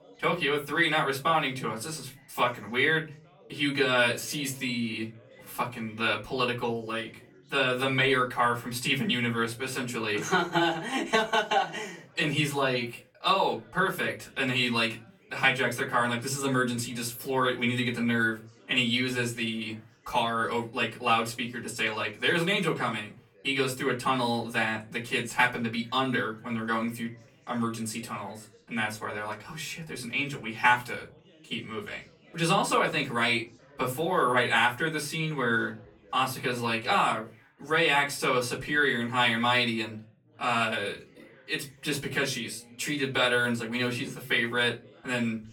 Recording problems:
off-mic speech; far
room echo; very slight; dies away in 0.3 s
background chatter; faint; throughout; 3 voices, 30 dB below the speech

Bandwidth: 18 kHz